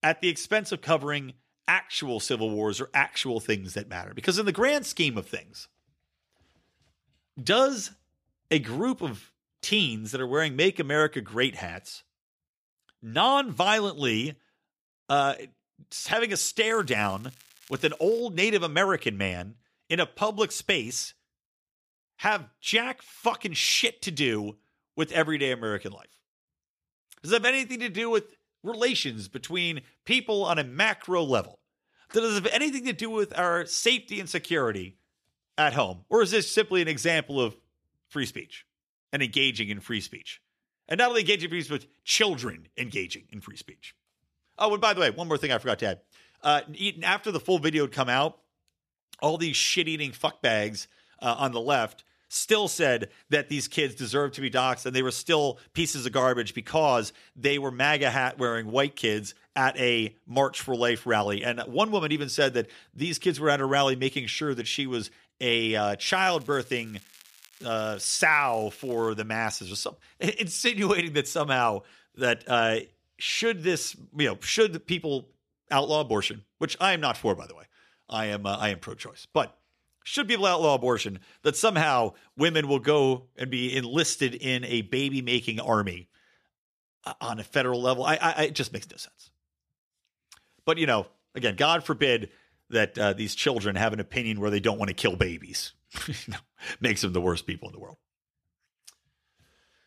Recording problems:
crackling; faint; from 17 to 18 s and from 1:06 to 1:09; 25 dB below the speech

